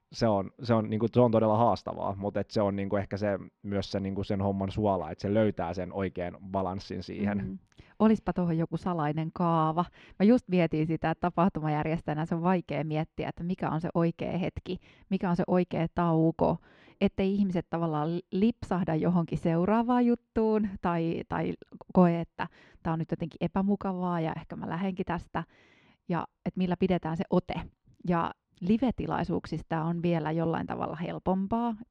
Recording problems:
muffled; very slightly; fading above 3.5 kHz

